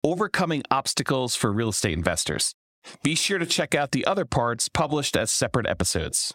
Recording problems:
squashed, flat; heavily

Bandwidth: 16 kHz